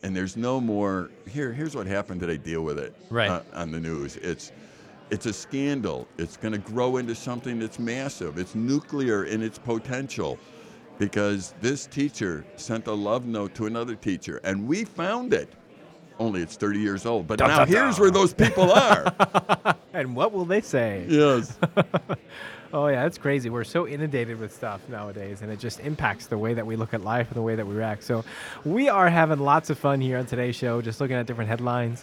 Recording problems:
chatter from many people; faint; throughout; 25 dB below the speech

